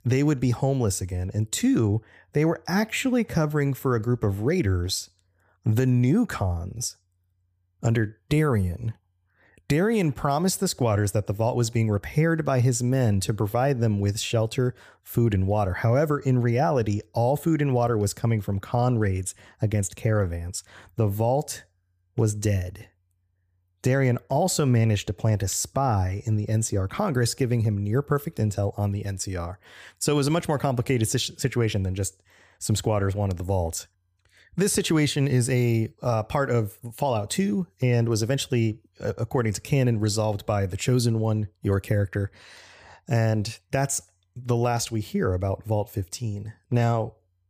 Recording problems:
none

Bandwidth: 15 kHz